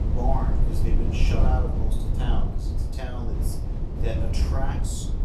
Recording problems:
off-mic speech; far
room echo; slight; dies away in 0.5 s
low rumble; loud; throughout; 4 dB below the speech

